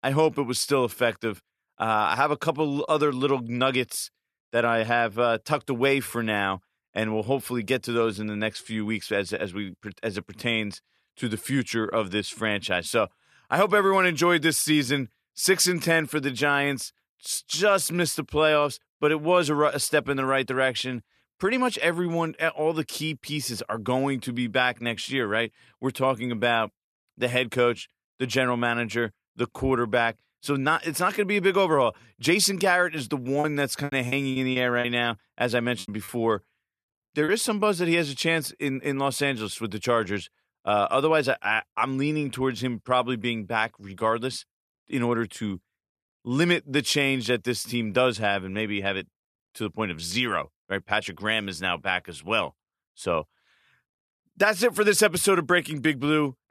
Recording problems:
choppy; very; from 33 to 37 s; 14% of the speech affected

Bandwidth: 13.5 kHz